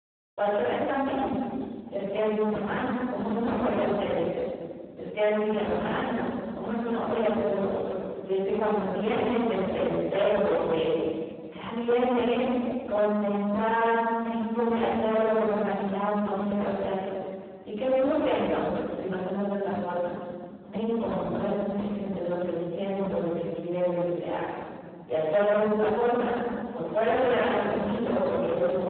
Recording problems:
phone-call audio; poor line
distortion; heavy; 19% of the sound clipped
room echo; strong; dies away in 2.1 s
off-mic speech; far

